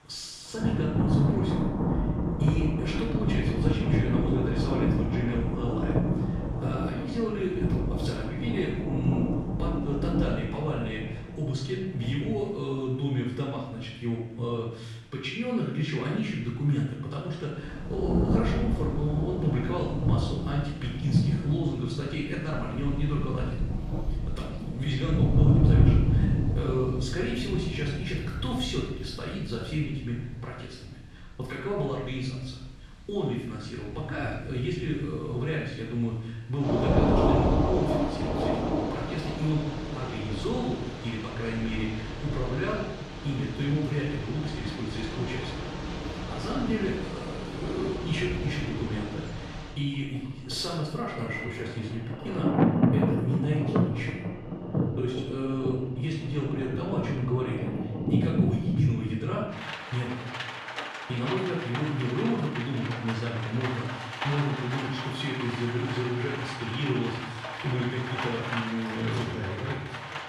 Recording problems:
off-mic speech; far
room echo; noticeable; dies away in 0.8 s
rain or running water; very loud; throughout; 1 dB above the speech

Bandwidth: 13.5 kHz